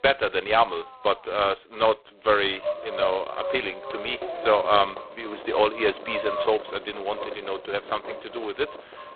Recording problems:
phone-call audio; poor line; nothing above 4 kHz
echo of what is said; strong; from 2.5 s on; 520 ms later, 9 dB below the speech
traffic noise; noticeable; throughout; 15 dB below the speech

